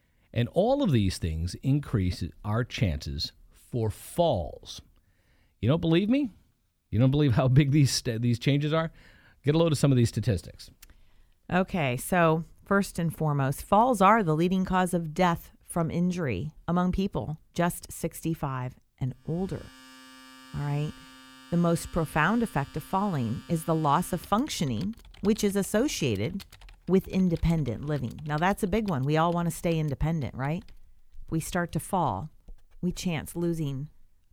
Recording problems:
household noises; faint; from 20 s on; 25 dB below the speech

